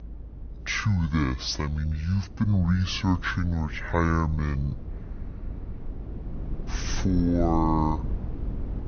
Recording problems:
wrong speed and pitch; too slow and too low; 0.5 times normal speed
low rumble; noticeable; throughout; 20 dB below the speech

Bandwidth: 6.5 kHz